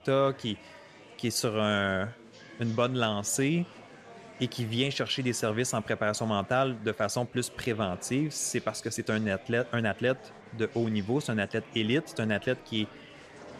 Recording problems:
murmuring crowd; noticeable; throughout; 20 dB below the speech

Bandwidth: 13.5 kHz